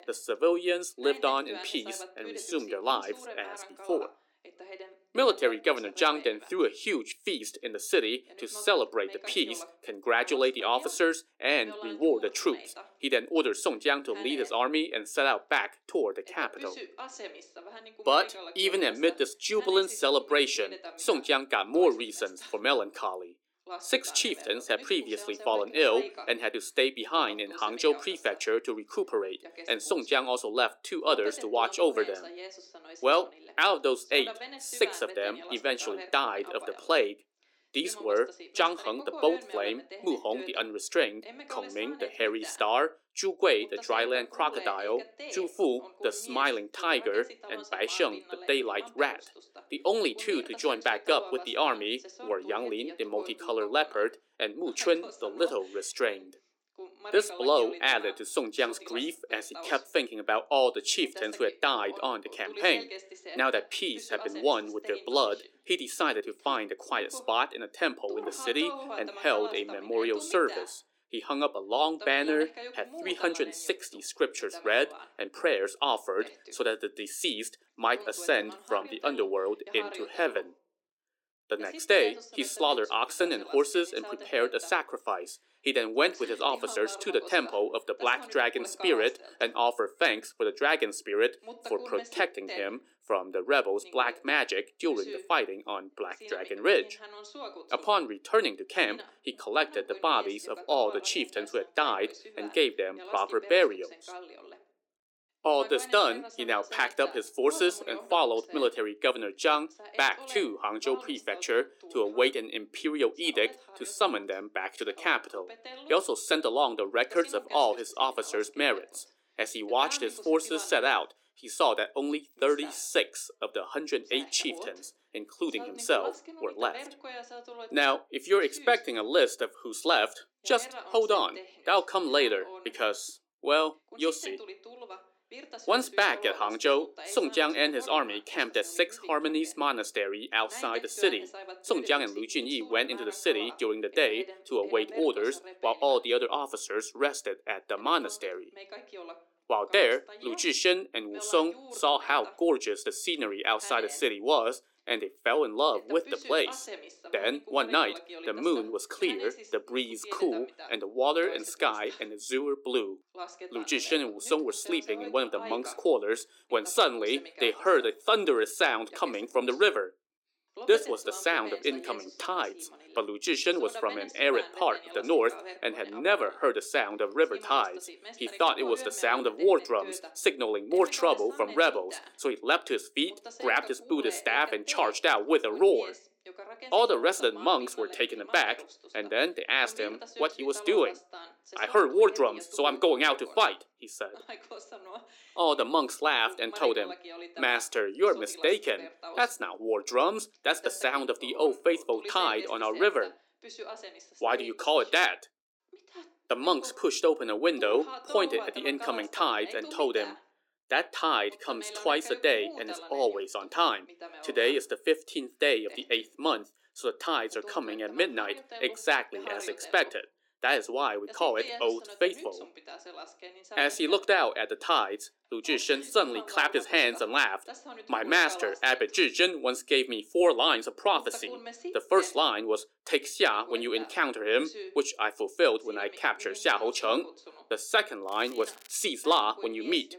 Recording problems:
thin; somewhat; fading below 350 Hz
voice in the background; noticeable; throughout; 15 dB below the speech
crackling; faint; at 3:01 and at 3:58; 25 dB below the speech

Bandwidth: 17 kHz